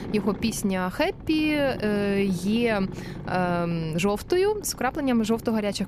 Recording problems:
low rumble; noticeable; throughout; 15 dB below the speech

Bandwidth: 14.5 kHz